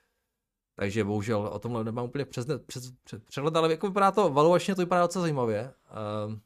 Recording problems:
none

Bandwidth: 15 kHz